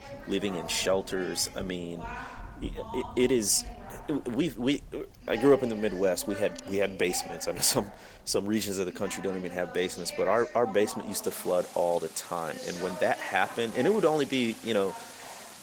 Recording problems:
garbled, watery; slightly; nothing above 18 kHz
rain or running water; noticeable; throughout; 20 dB below the speech
voice in the background; noticeable; throughout; 15 dB below the speech

